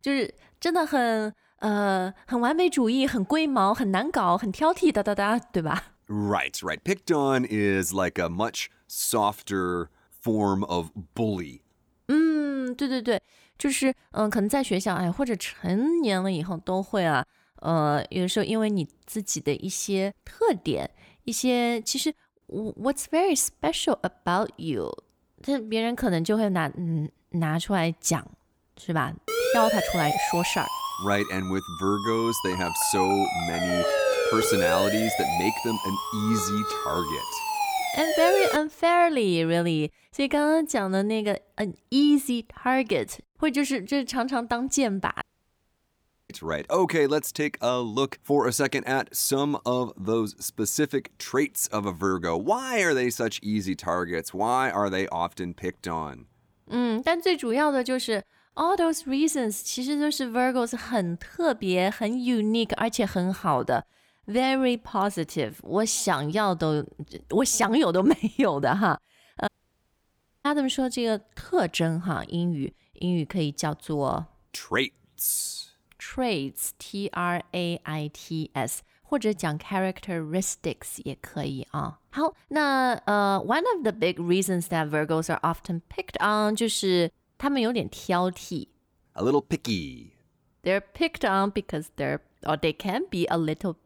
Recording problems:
siren; loud; from 29 to 39 s; peak 3 dB above the speech
audio cutting out; at 45 s for 1 s and at 1:09 for 1 s

